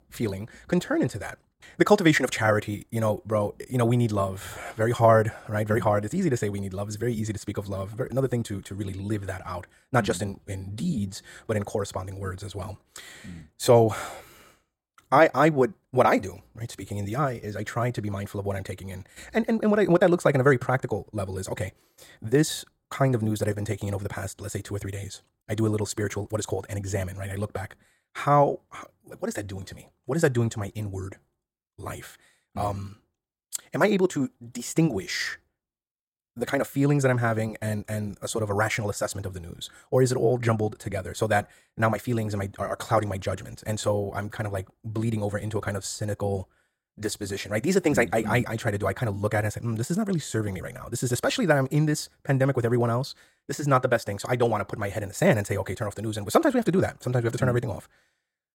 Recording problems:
wrong speed, natural pitch; too fast; 1.5 times normal speed

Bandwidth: 16.5 kHz